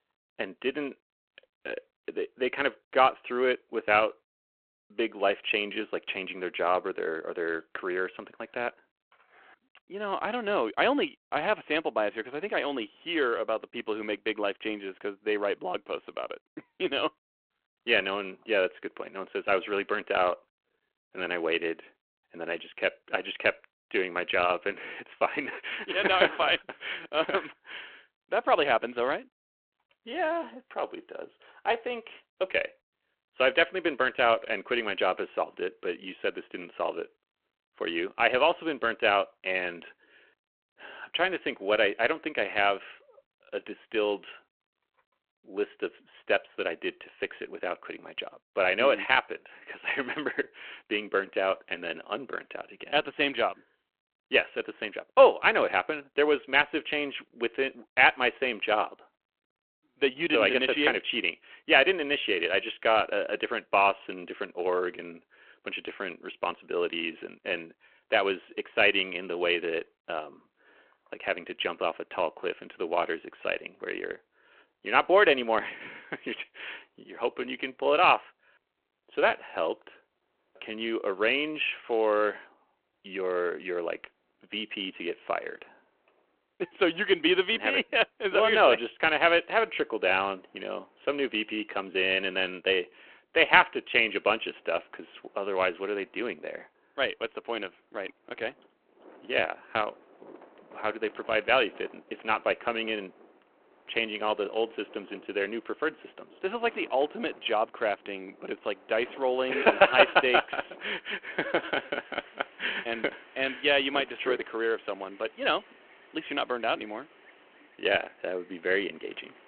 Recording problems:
phone-call audio
wind in the background; faint; throughout; 25 dB below the speech

